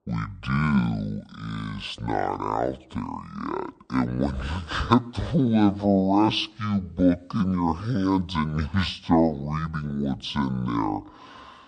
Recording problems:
wrong speed and pitch; too slow and too low; 0.6 times normal speed

